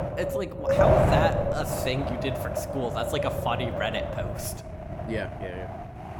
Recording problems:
wind noise on the microphone; heavy; 3 dB above the speech

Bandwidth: 18 kHz